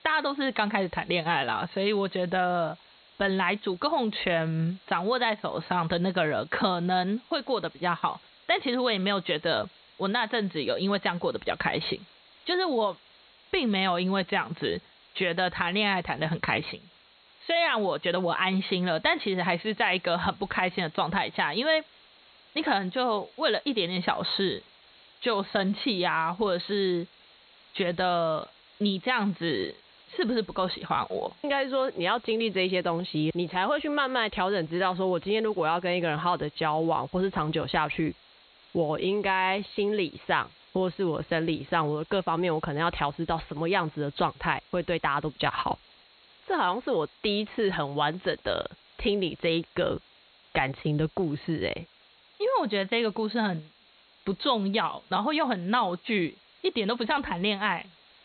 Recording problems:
high frequencies cut off; severe; nothing above 4 kHz
hiss; faint; throughout; 25 dB below the speech

